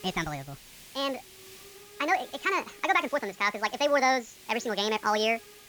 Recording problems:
wrong speed and pitch; too fast and too high; 1.6 times normal speed
high frequencies cut off; noticeable; nothing above 7.5 kHz
hiss; faint; throughout; 20 dB below the speech

